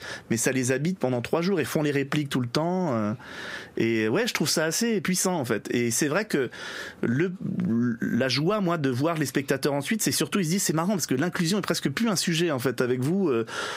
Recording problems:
squashed, flat; heavily

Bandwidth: 15.5 kHz